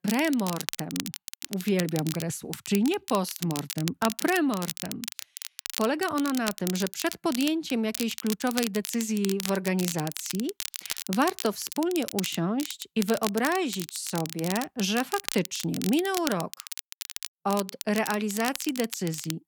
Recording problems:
crackle, like an old record; loud; 7 dB below the speech

